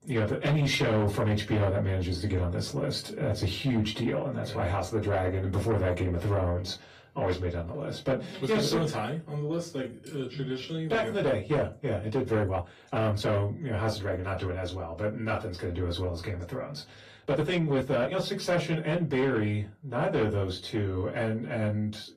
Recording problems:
off-mic speech; far
distortion; slight; 10 dB below the speech
room echo; very slight; dies away in 0.2 s
garbled, watery; slightly; nothing above 14.5 kHz
uneven, jittery; strongly; from 9.5 to 18 s

